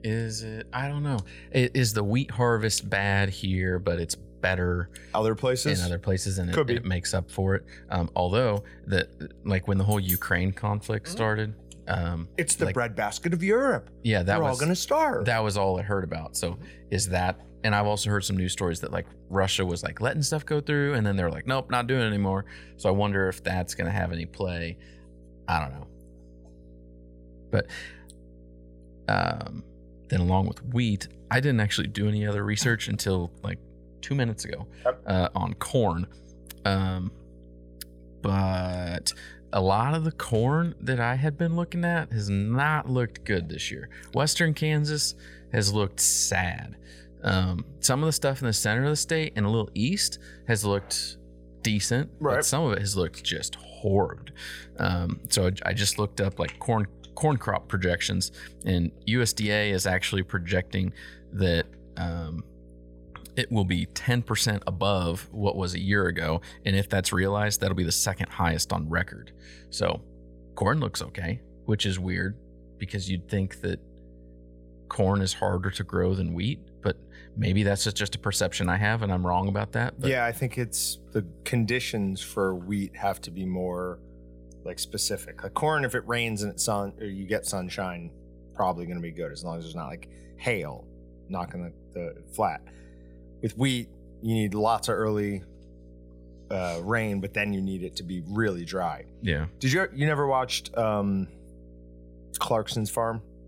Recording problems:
electrical hum; faint; throughout; 60 Hz, 30 dB below the speech

